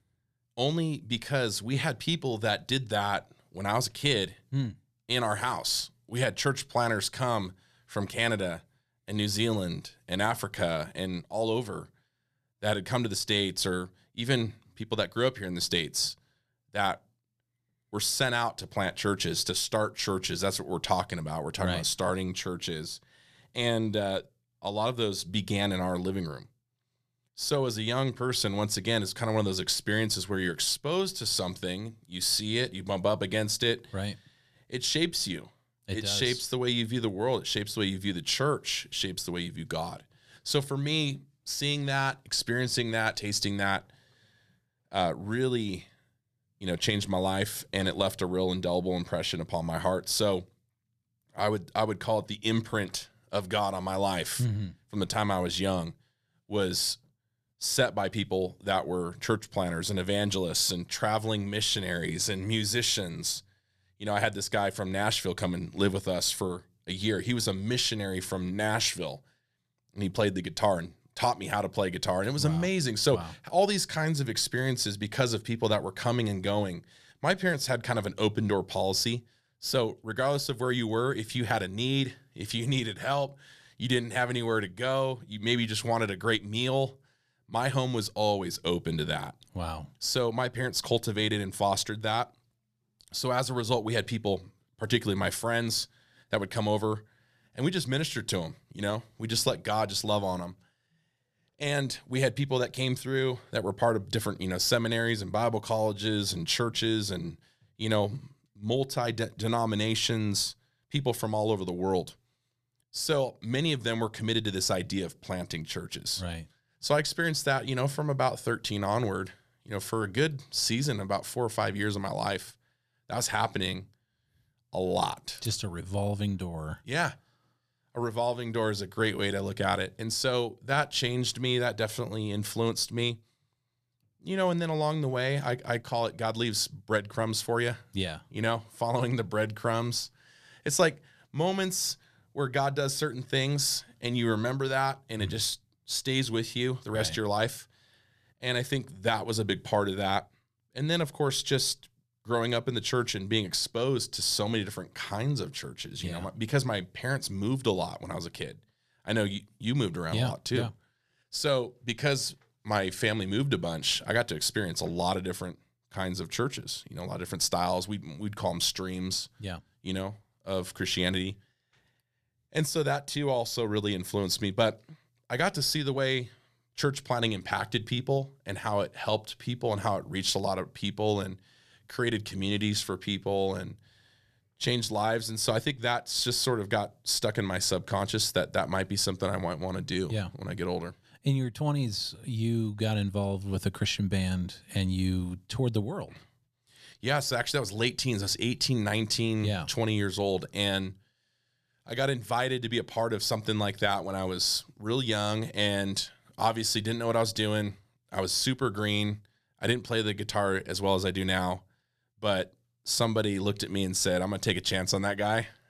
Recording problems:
none

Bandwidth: 14.5 kHz